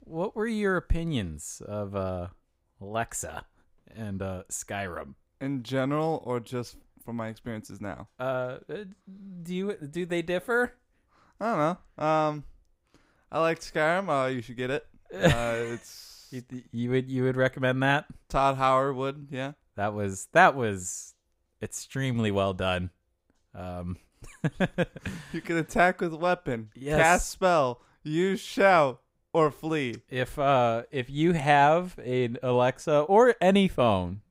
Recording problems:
none

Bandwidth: 15.5 kHz